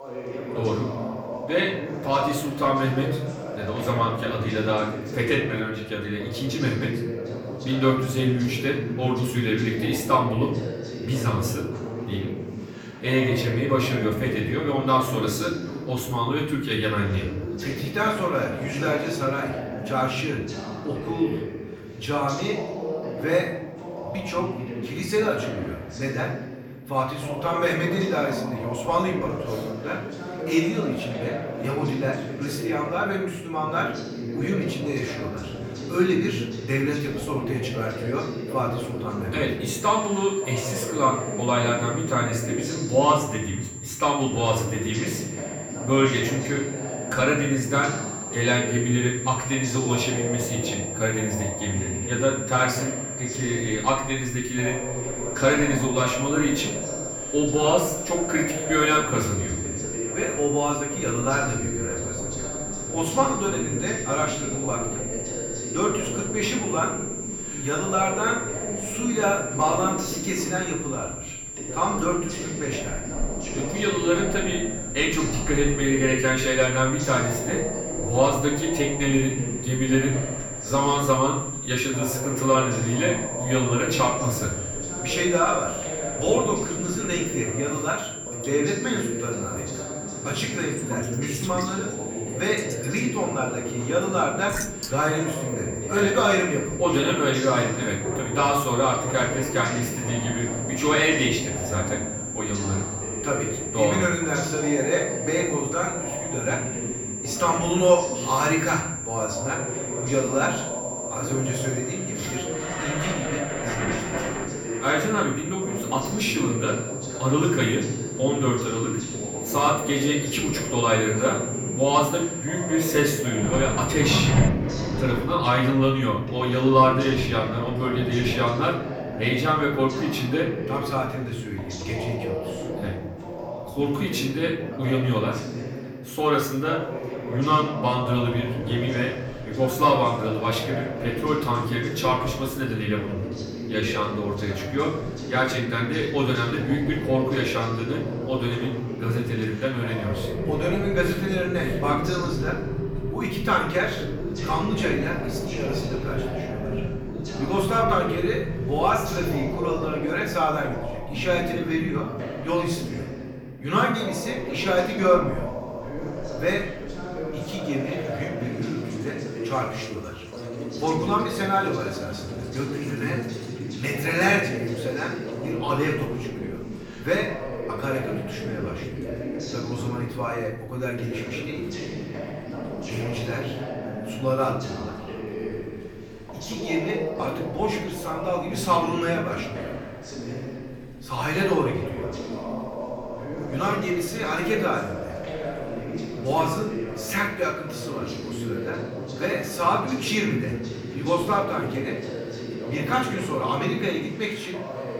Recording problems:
off-mic speech; far
room echo; slight; dies away in 0.7 s
high-pitched whine; loud; from 40 s to 2:04; 7.5 kHz, 7 dB below the speech
rain or running water; loud; from 53 s on; 10 dB below the speech
voice in the background; loud; throughout; 8 dB below the speech

